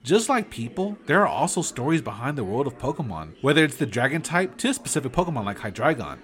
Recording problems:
background chatter; faint; throughout; 4 voices, 20 dB below the speech

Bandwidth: 16.5 kHz